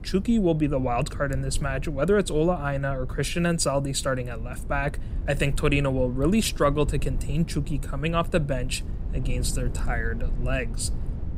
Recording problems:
low rumble; noticeable; throughout; 20 dB below the speech

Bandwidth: 15.5 kHz